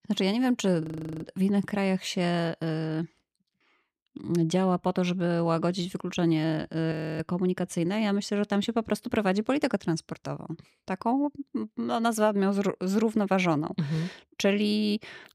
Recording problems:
audio freezing; at 1 s and at 7 s

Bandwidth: 15.5 kHz